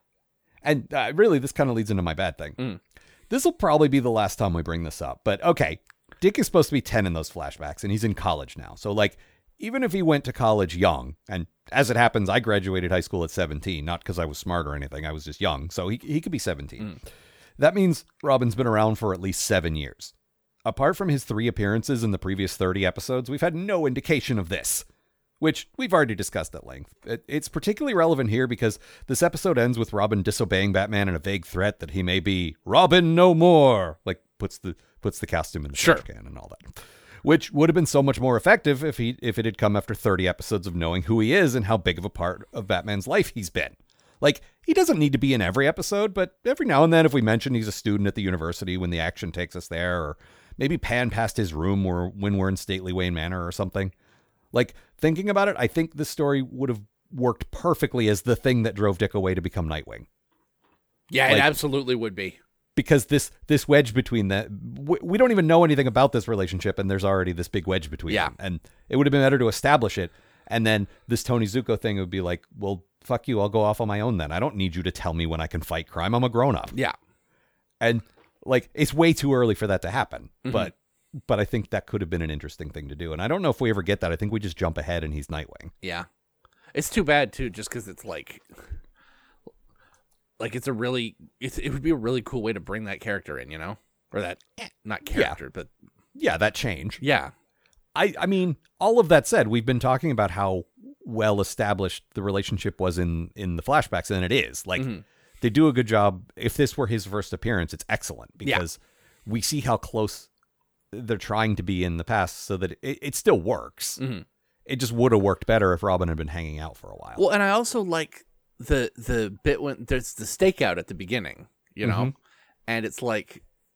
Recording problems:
none

